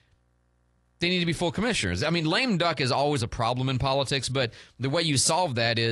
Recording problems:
garbled, watery; slightly
abrupt cut into speech; at the end

